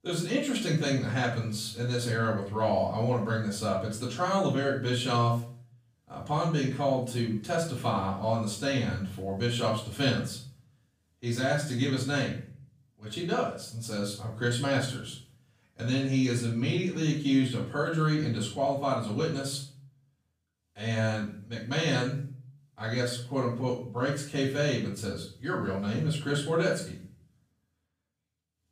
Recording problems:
off-mic speech; far
room echo; slight; dies away in 0.4 s

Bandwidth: 15 kHz